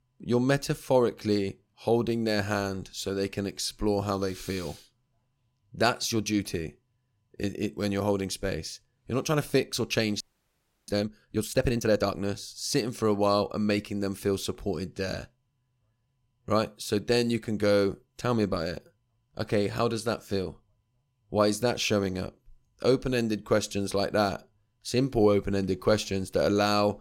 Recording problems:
audio freezing; at 10 s for 0.5 s

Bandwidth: 16.5 kHz